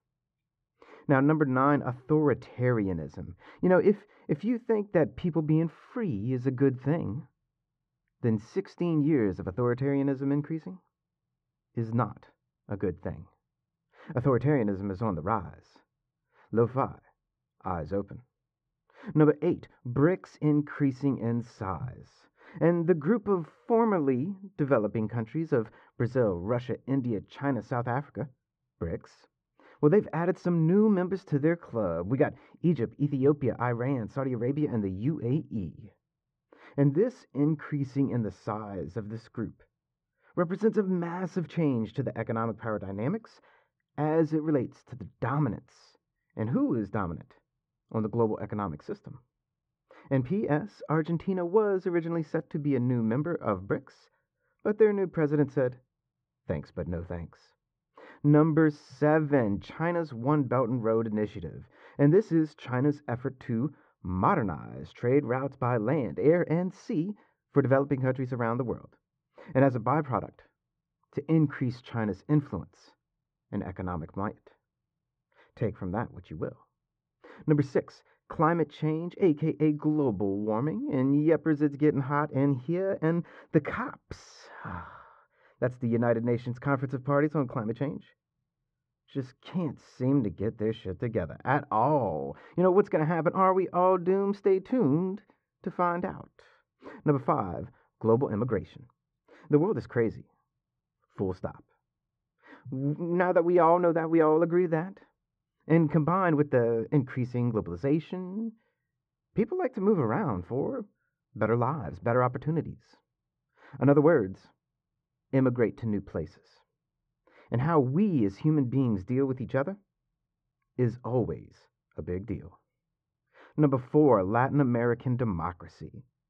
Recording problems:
muffled; very; fading above 1 kHz

